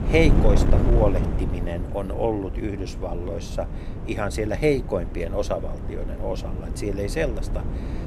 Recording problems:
wind noise on the microphone; heavy; 8 dB below the speech

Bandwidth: 13.5 kHz